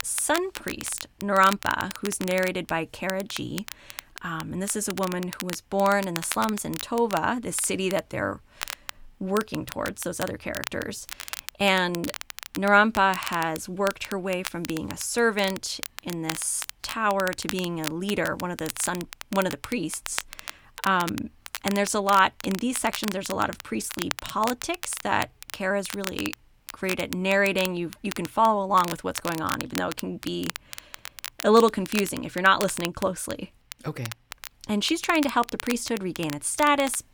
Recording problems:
crackle, like an old record; noticeable; 10 dB below the speech

